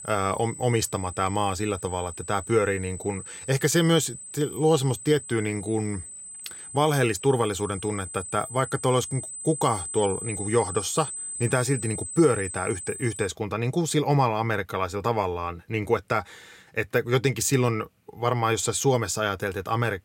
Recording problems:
high-pitched whine; loud; until 13 s; 8 kHz, 9 dB below the speech

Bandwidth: 16 kHz